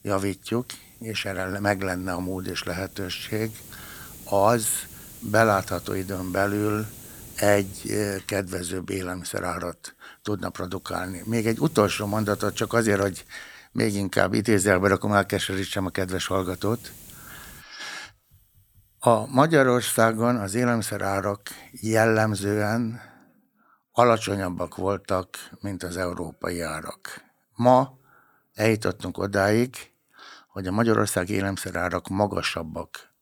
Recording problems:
hiss; noticeable; until 23 s; 20 dB below the speech

